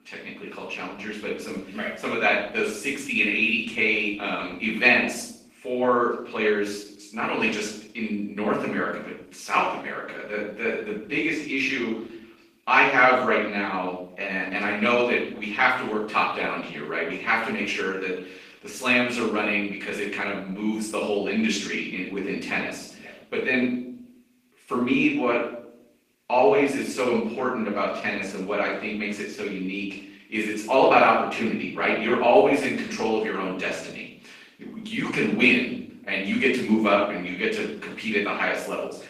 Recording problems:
off-mic speech; far
room echo; noticeable; dies away in 0.6 s
garbled, watery; slightly; nothing above 15 kHz
thin; very slightly; fading below 300 Hz

